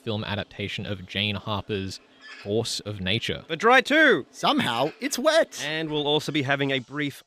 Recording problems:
animal sounds; faint; throughout; 25 dB below the speech

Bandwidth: 15 kHz